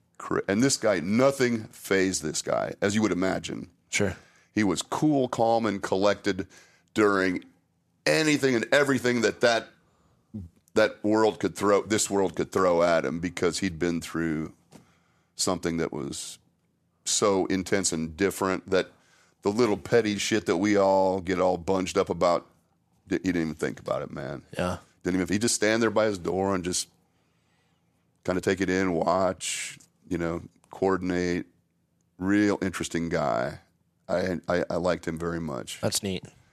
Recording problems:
uneven, jittery; strongly; from 5 to 34 s

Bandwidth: 14 kHz